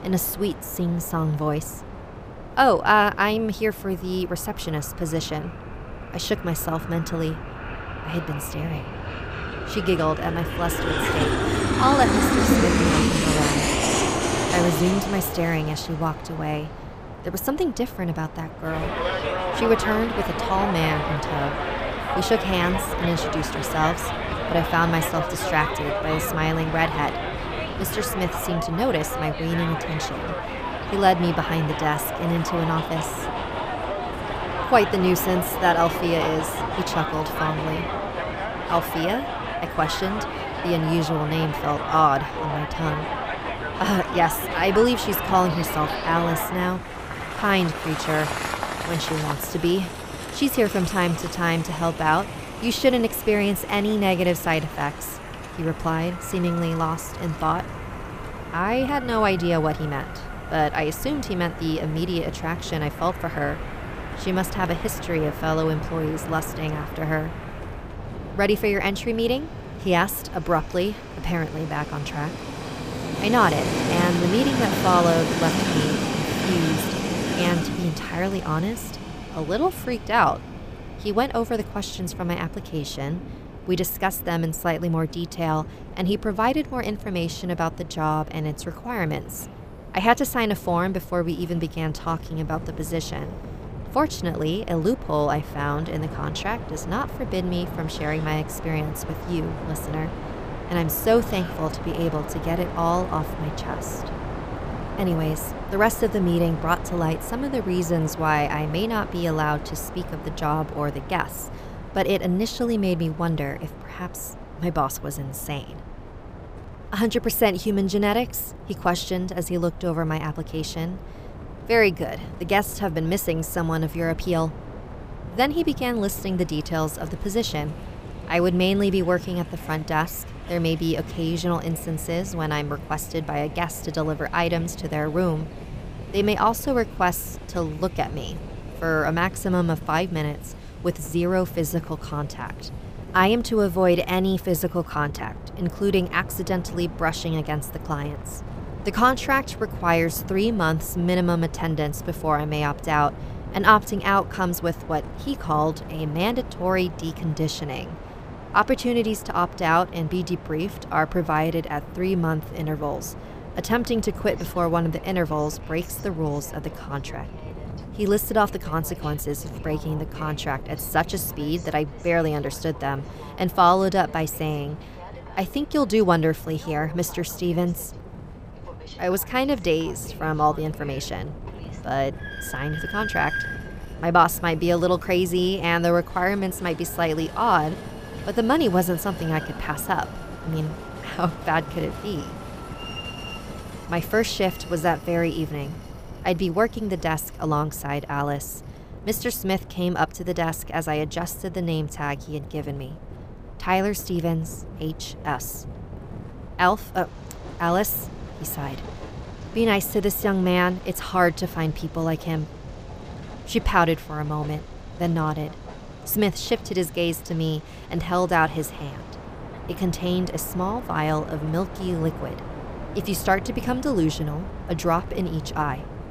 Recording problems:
train or aircraft noise; loud; throughout; 6 dB below the speech
wind noise on the microphone; occasional gusts; 20 dB below the speech

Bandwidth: 15 kHz